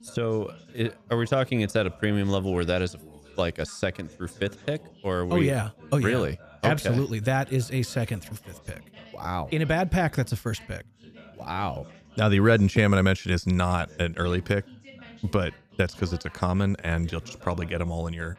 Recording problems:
background chatter; faint; throughout; 2 voices, 25 dB below the speech

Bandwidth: 14.5 kHz